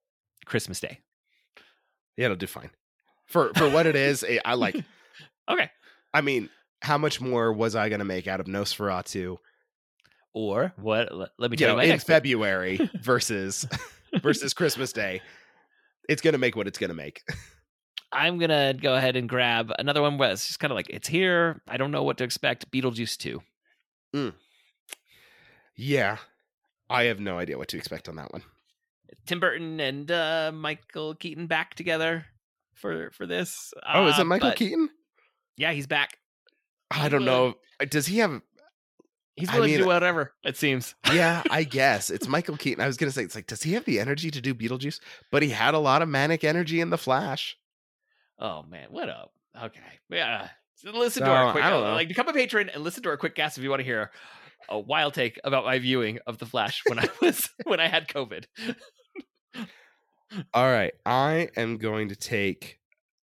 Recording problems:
none

